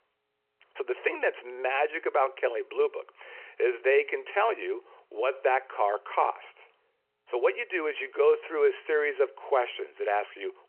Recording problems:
phone-call audio

